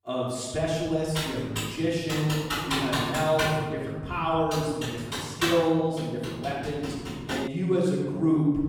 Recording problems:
room echo; strong; dies away in 2.2 s
off-mic speech; far
keyboard typing; loud; from 1 to 7.5 s; peak level with the speech

